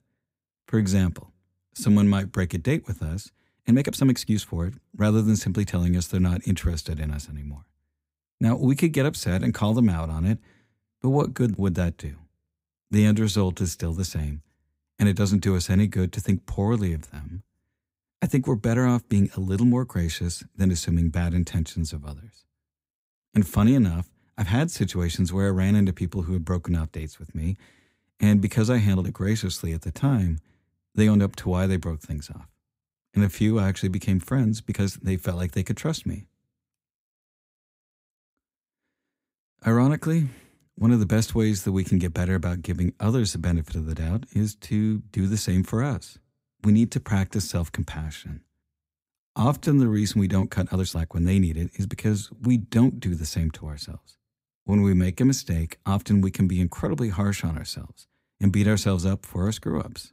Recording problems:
uneven, jittery; strongly; from 0.5 to 55 s

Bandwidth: 15.5 kHz